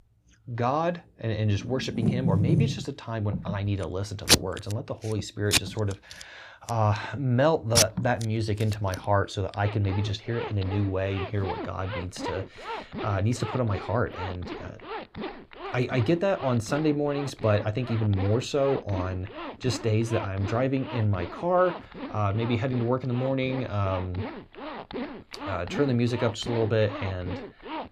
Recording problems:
household noises; loud; throughout; 5 dB below the speech

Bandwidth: 15 kHz